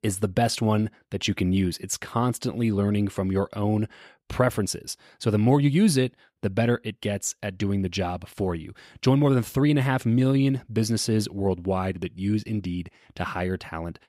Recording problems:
none

